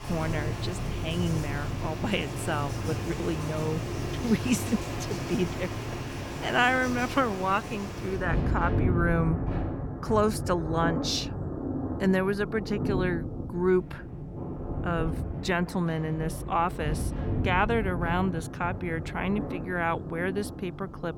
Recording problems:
rain or running water; loud; throughout; 4 dB below the speech

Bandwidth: 18 kHz